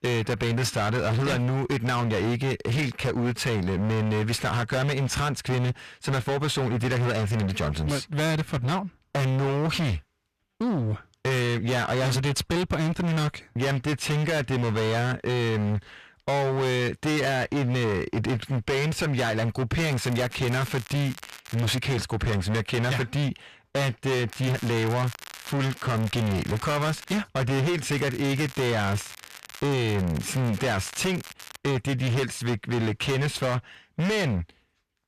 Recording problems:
distortion; heavy; 32% of the sound clipped
crackling; noticeable; from 20 to 22 s, from 24 to 27 s and from 28 to 32 s; 15 dB below the speech

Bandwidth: 14.5 kHz